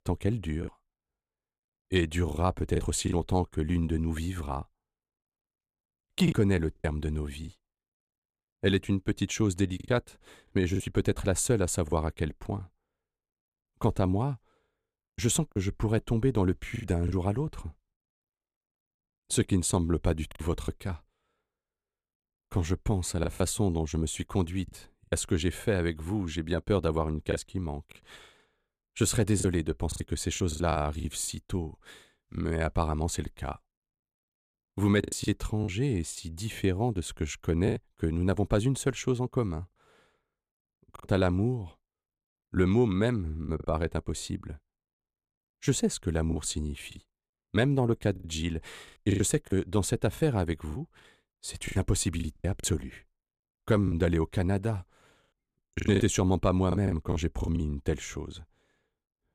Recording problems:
choppy; very; 7% of the speech affected

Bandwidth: 14.5 kHz